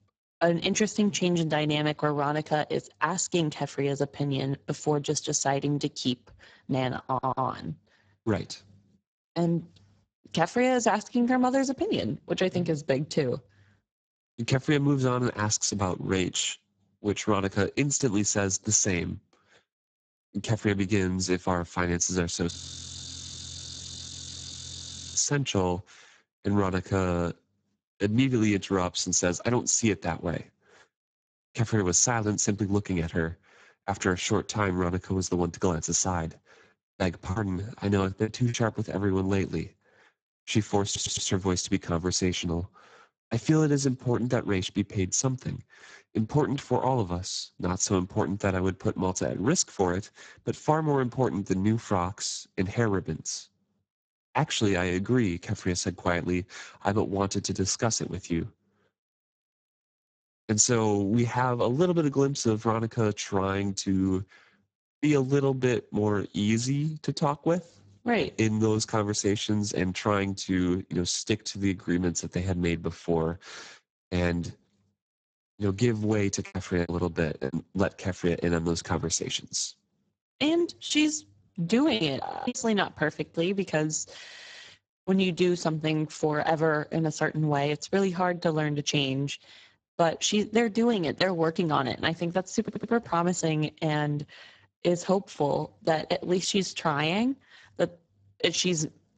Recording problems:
garbled, watery; badly; nothing above 7.5 kHz
audio stuttering; 4 times, first at 7 s
audio freezing; at 23 s for 2.5 s and at 1:22
choppy; very; from 37 to 39 s, from 1:16 to 1:18 and from 1:21 to 1:23; 12% of the speech affected

